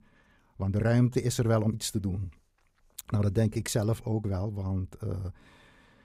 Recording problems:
uneven, jittery; strongly; from 0.5 to 5.5 s

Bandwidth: 15.5 kHz